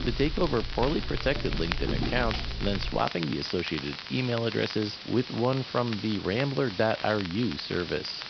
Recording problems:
high frequencies cut off; noticeable; nothing above 5.5 kHz
hiss; noticeable; throughout; 10 dB below the speech
crackle, like an old record; noticeable; 10 dB below the speech
footsteps; noticeable; until 3 s; peak 2 dB below the speech

